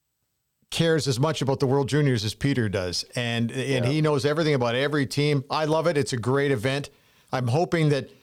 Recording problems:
none

